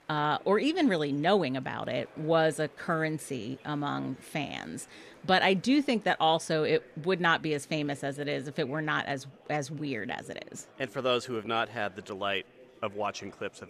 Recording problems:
murmuring crowd; faint; throughout; 25 dB below the speech

